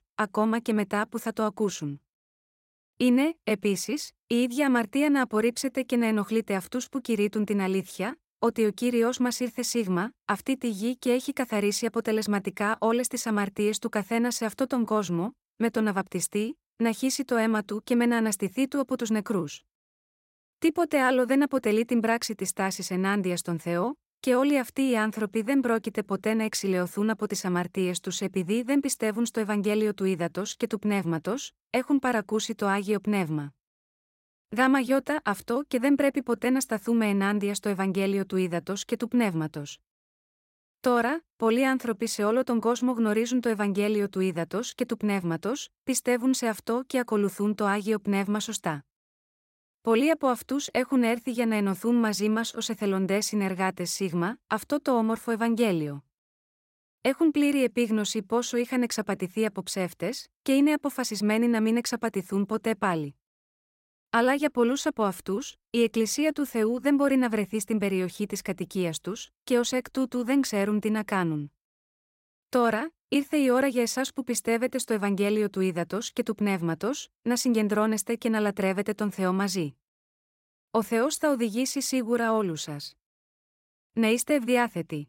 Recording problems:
none

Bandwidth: 16 kHz